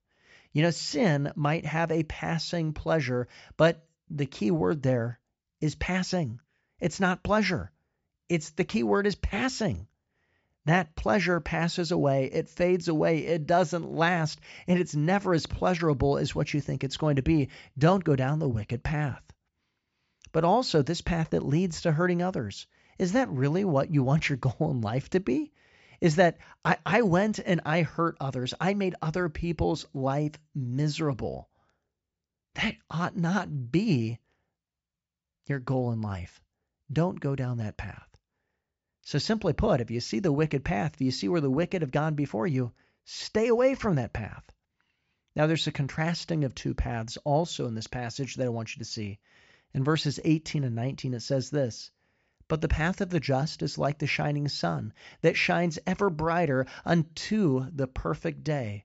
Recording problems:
high frequencies cut off; noticeable; nothing above 8 kHz

